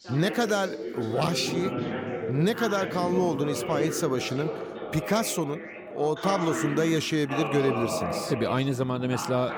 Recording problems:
background chatter; loud; throughout; 3 voices, 5 dB below the speech

